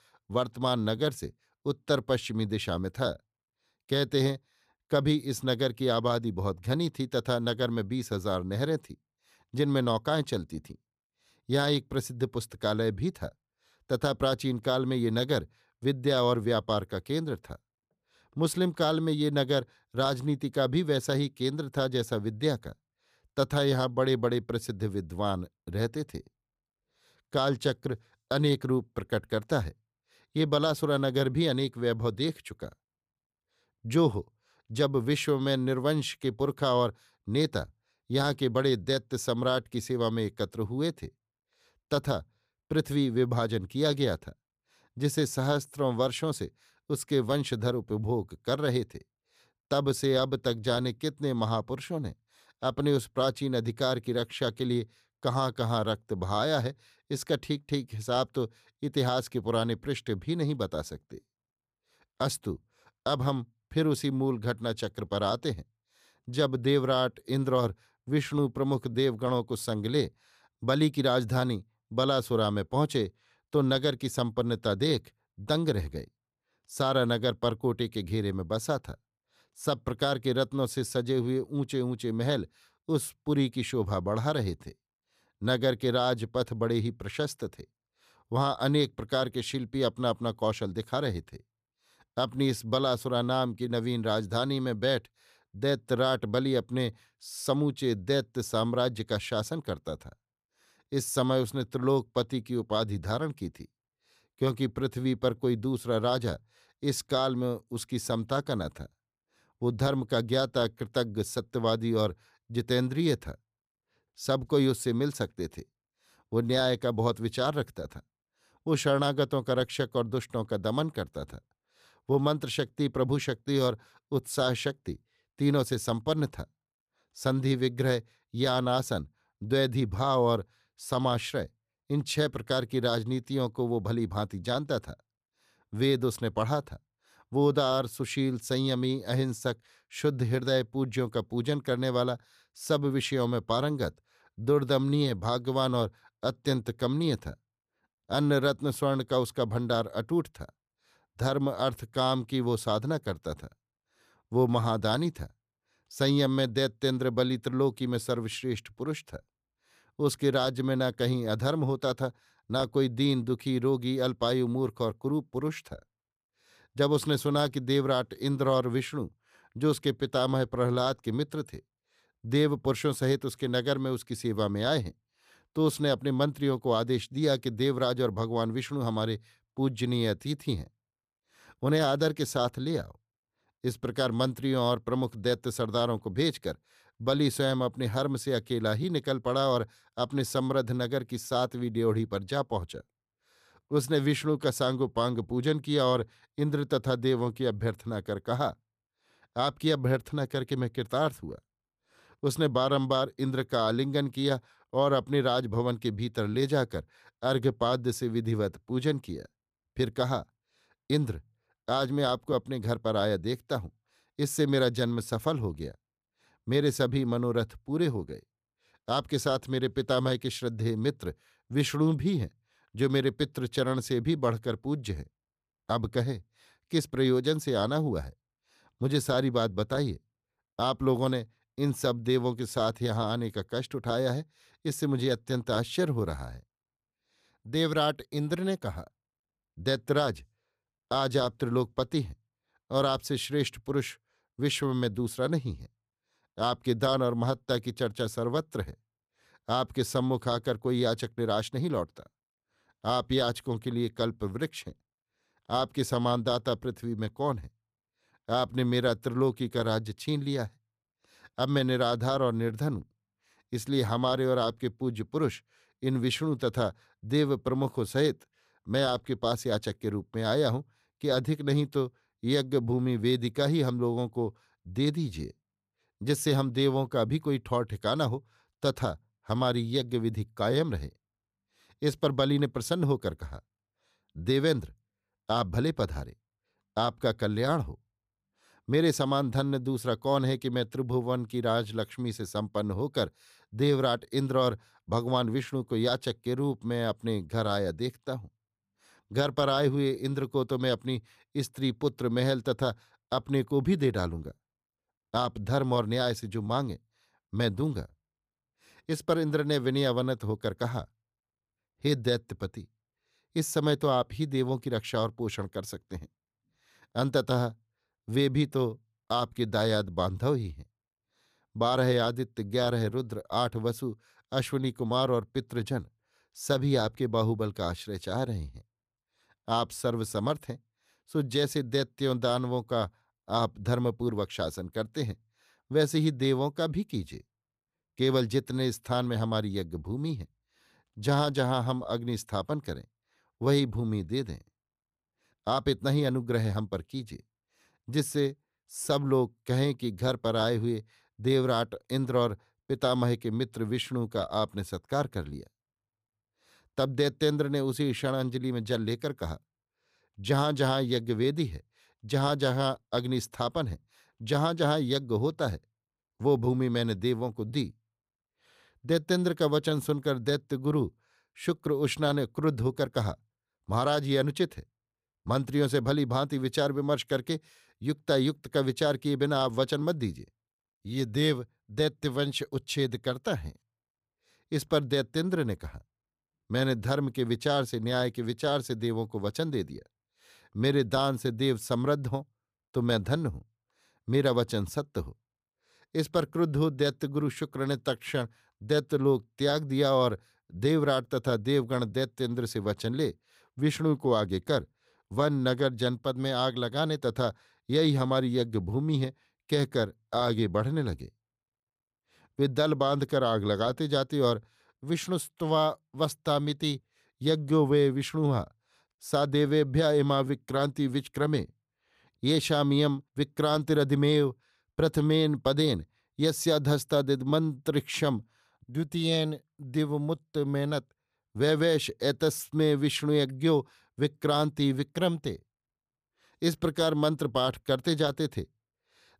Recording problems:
none

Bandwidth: 14.5 kHz